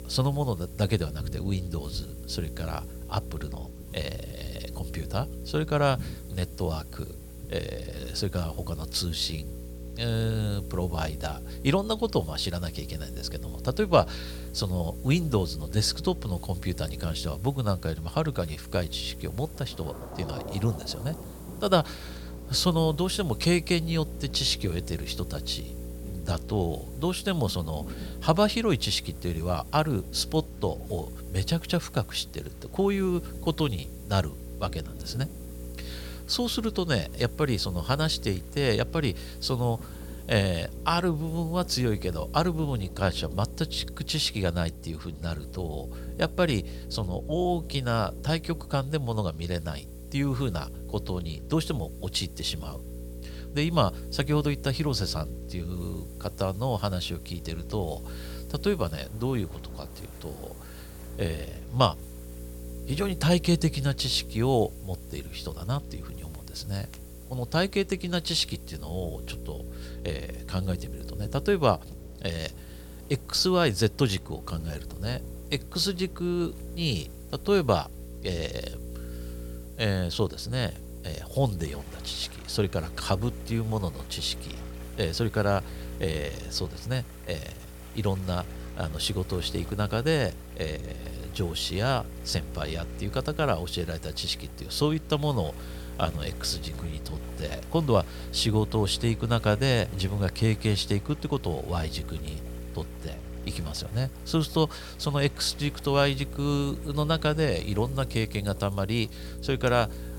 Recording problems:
electrical hum; noticeable; throughout; 60 Hz, 20 dB below the speech
rain or running water; faint; throughout; 20 dB below the speech
hiss; faint; throughout; 25 dB below the speech

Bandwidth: 17.5 kHz